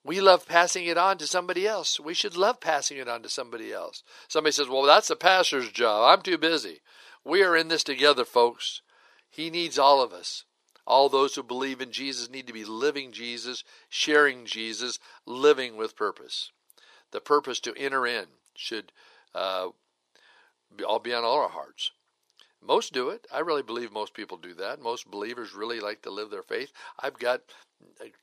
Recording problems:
thin; very; fading below 400 Hz

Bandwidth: 14.5 kHz